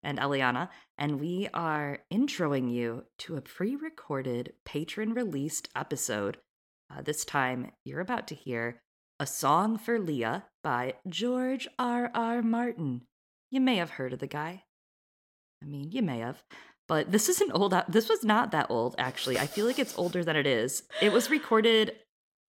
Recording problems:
none

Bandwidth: 16.5 kHz